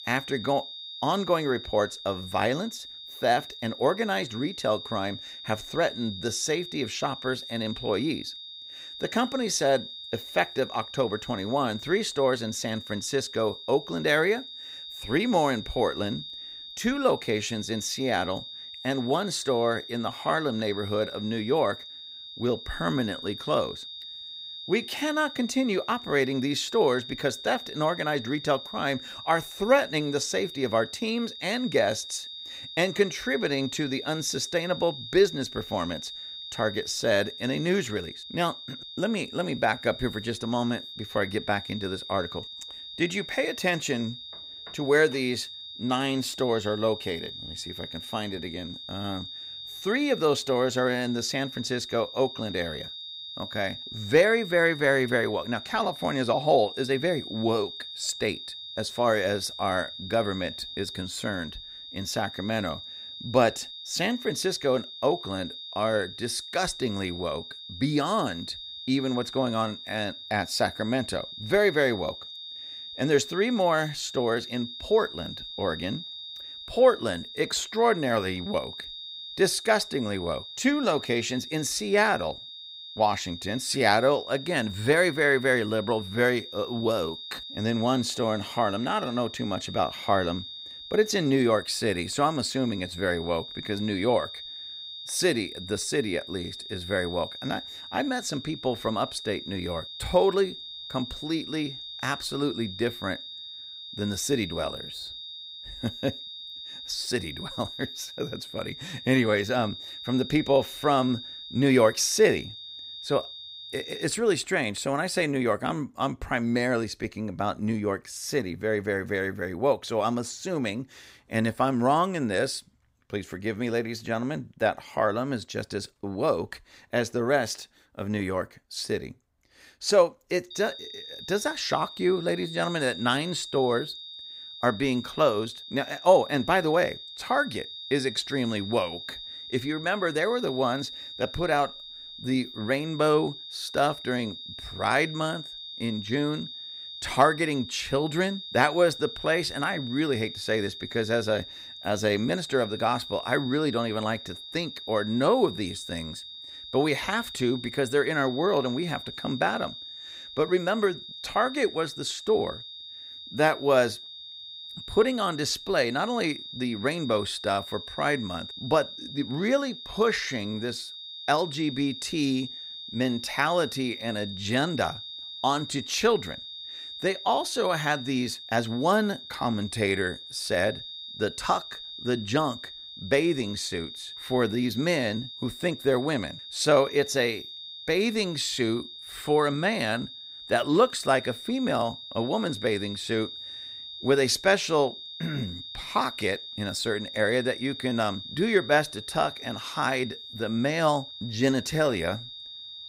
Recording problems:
high-pitched whine; noticeable; until 1:54 and from 2:11 on; 3.5 kHz, 10 dB below the speech

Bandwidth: 15.5 kHz